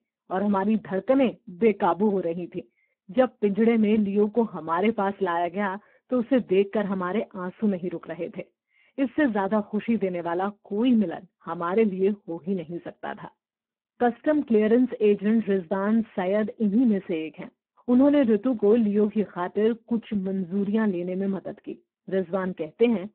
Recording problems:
phone-call audio; poor line

